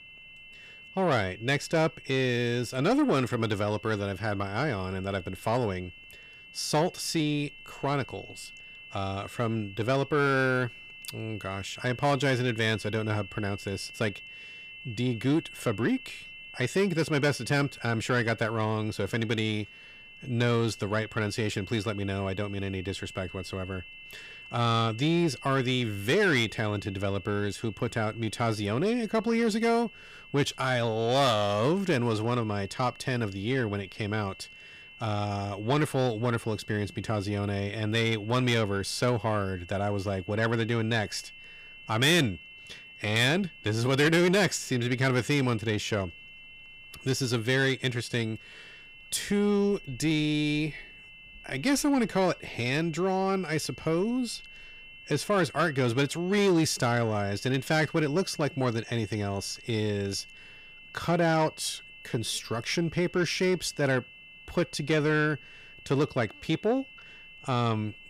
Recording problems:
distortion; slight; 10 dB below the speech
high-pitched whine; noticeable; throughout; 2.5 kHz, 20 dB below the speech

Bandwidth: 15 kHz